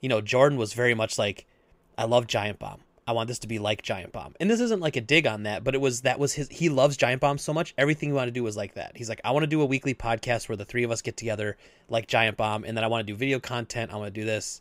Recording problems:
none

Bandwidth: 15.5 kHz